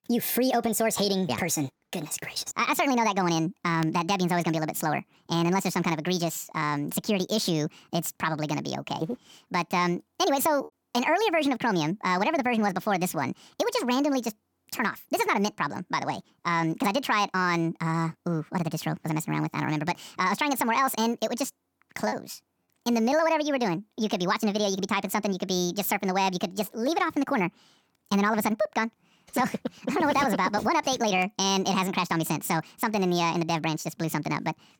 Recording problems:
wrong speed and pitch; too fast and too high; 1.5 times normal speed
choppy; occasionally; at 22 s; 1% of the speech affected

